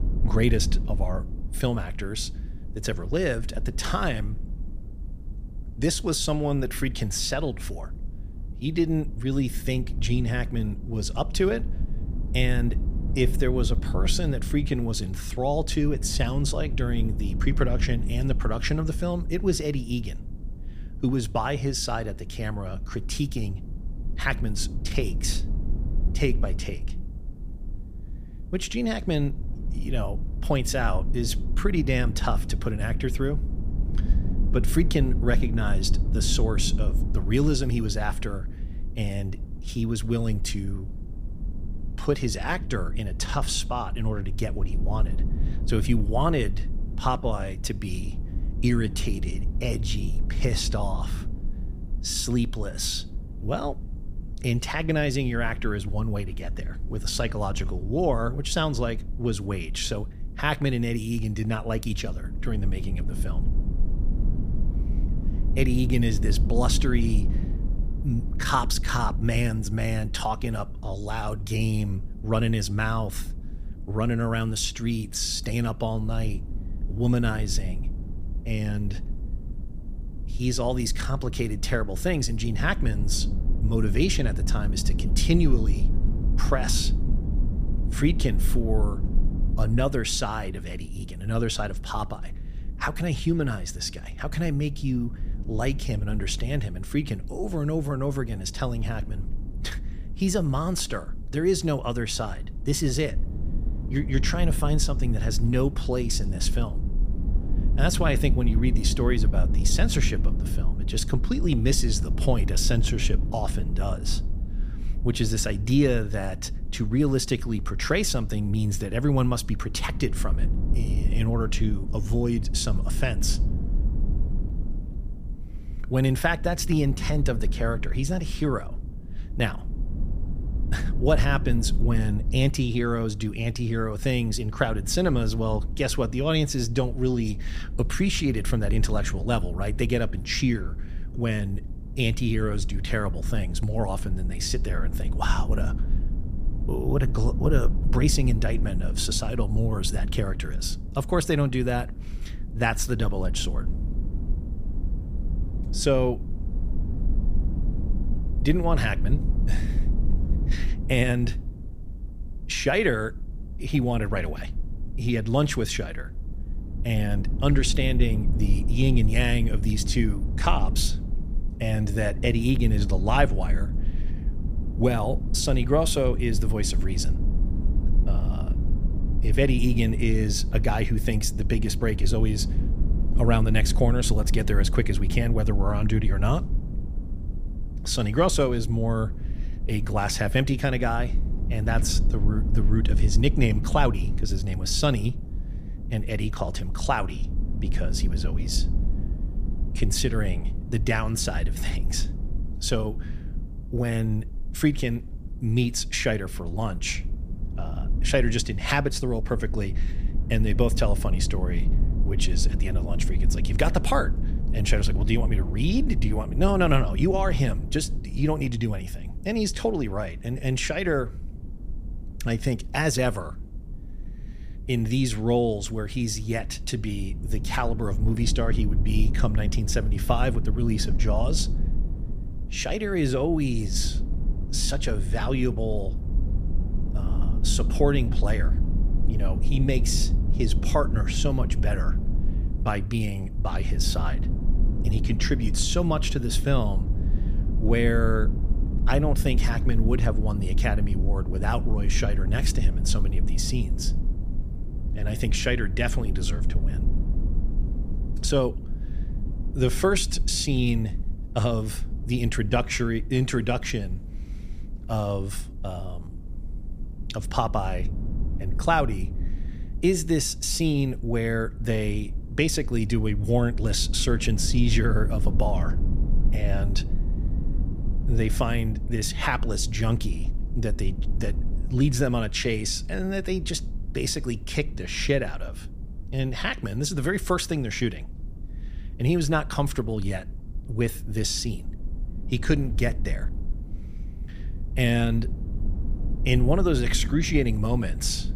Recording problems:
low rumble; noticeable; throughout; 15 dB below the speech

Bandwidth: 15 kHz